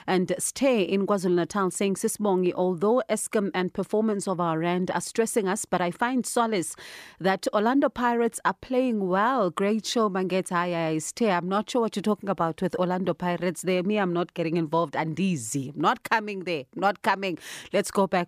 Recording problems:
none

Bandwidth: 14.5 kHz